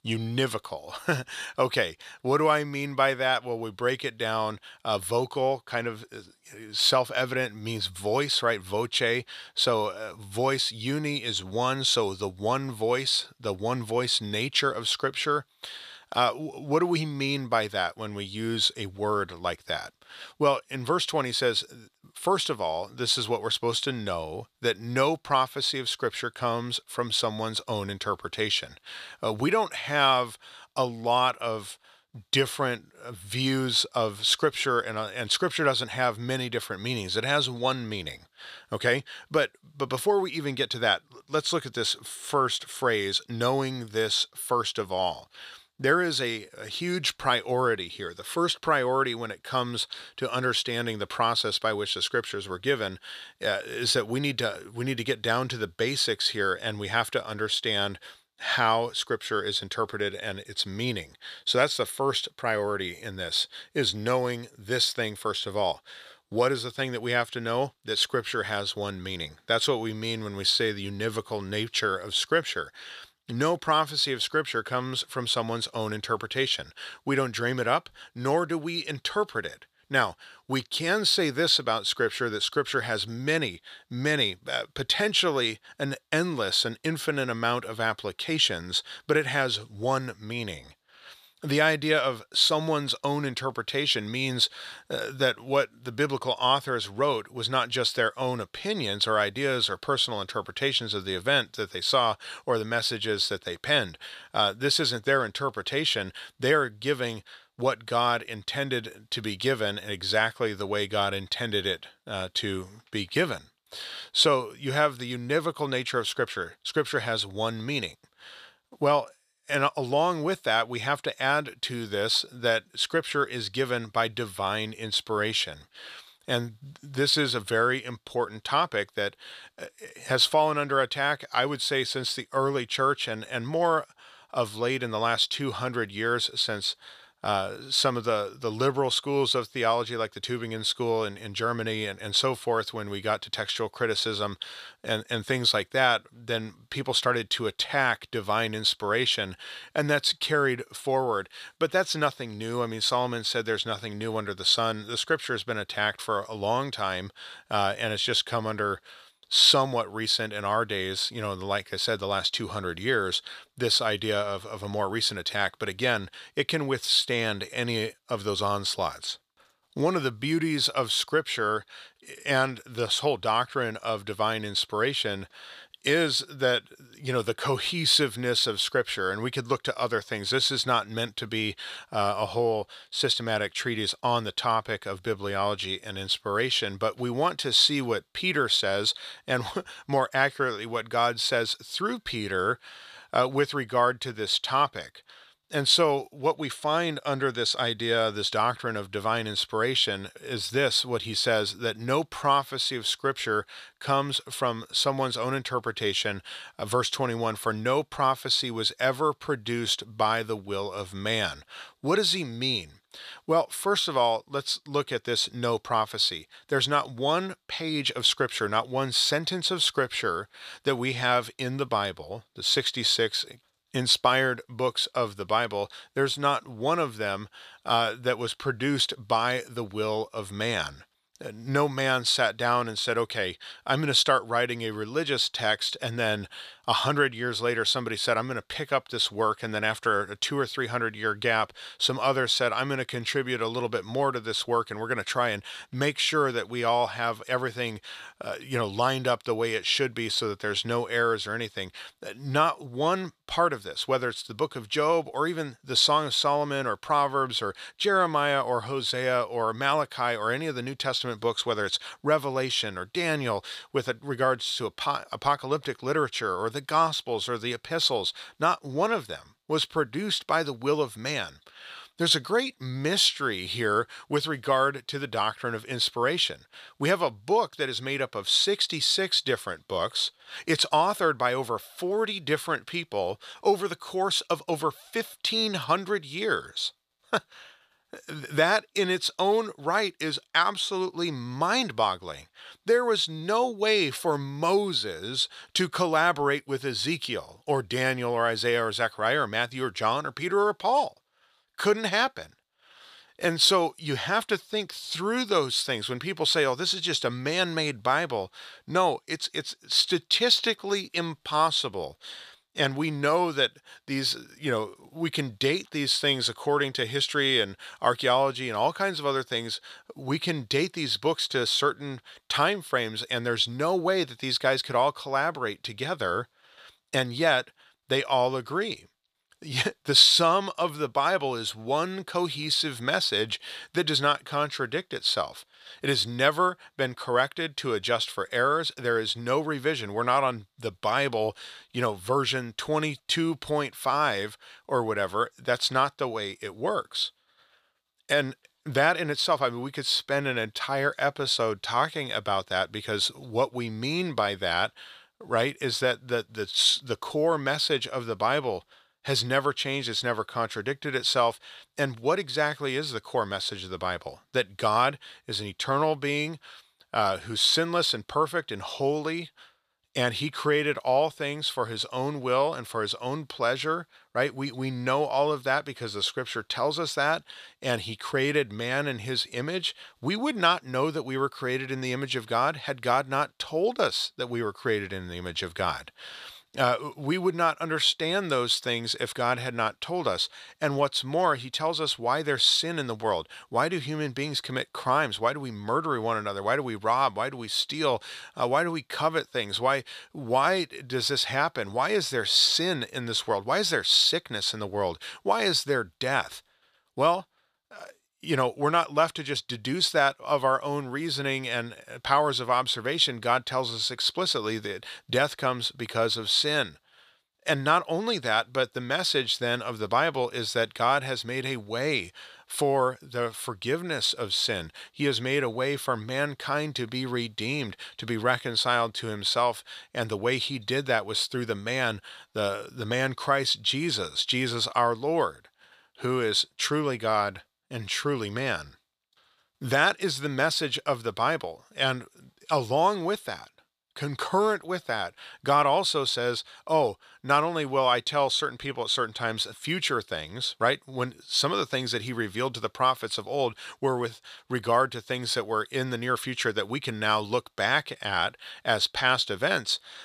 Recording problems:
thin; somewhat; fading below 1 kHz

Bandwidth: 14.5 kHz